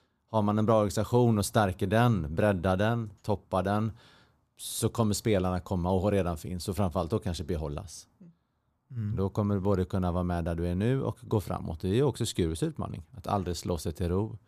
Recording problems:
none

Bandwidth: 14.5 kHz